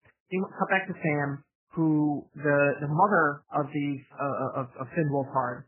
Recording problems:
garbled, watery; badly; nothing above 2.5 kHz

